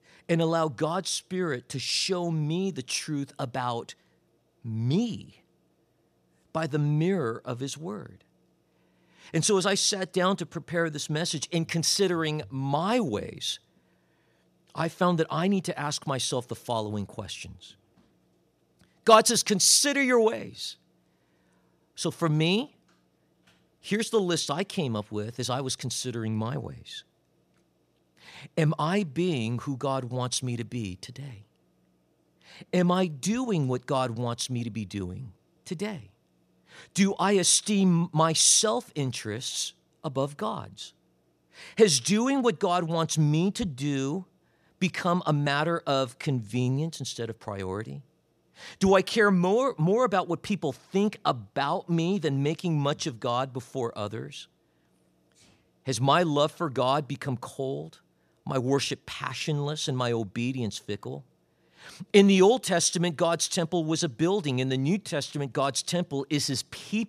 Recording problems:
none

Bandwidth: 14.5 kHz